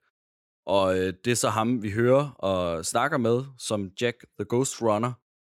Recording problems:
none

